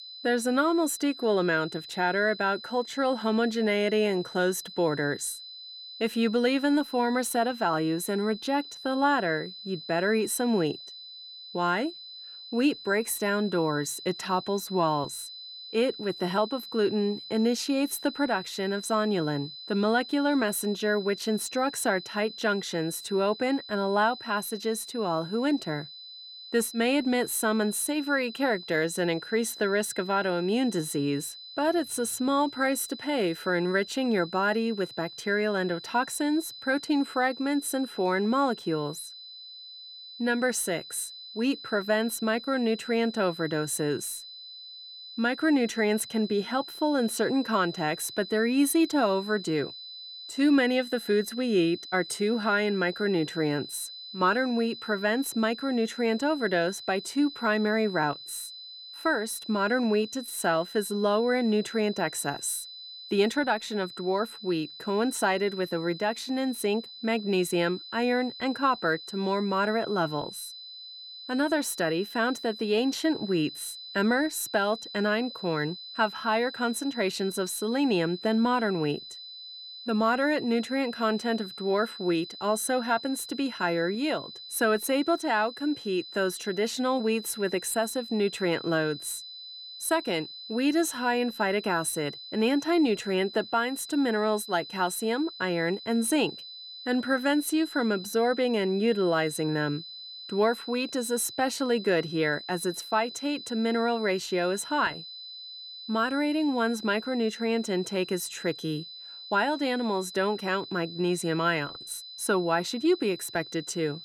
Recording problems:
high-pitched whine; noticeable; throughout; 4 kHz, 15 dB below the speech

